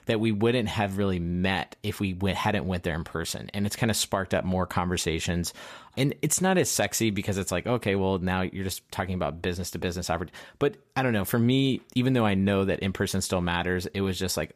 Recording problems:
none

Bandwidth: 14.5 kHz